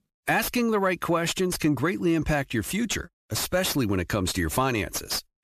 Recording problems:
distortion; slight; 9 dB below the speech

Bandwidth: 14.5 kHz